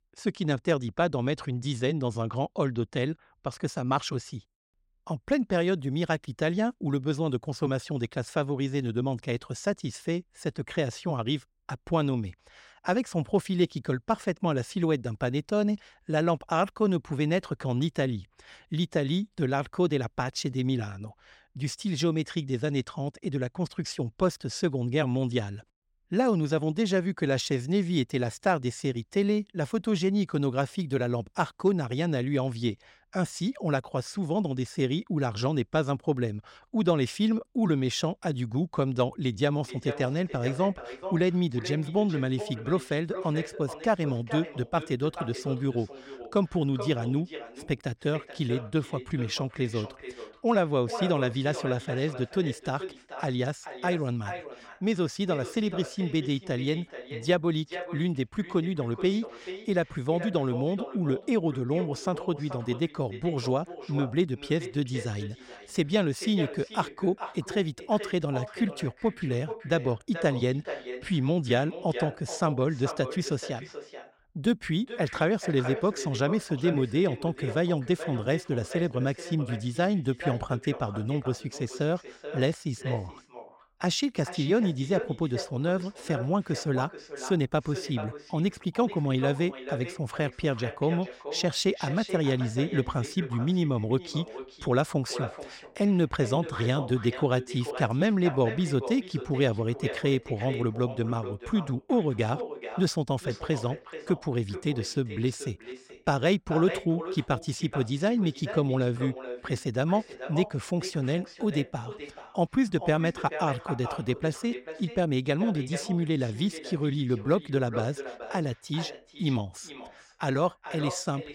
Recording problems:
echo of what is said; strong; from 40 s on; 430 ms later, 10 dB below the speech

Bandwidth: 16 kHz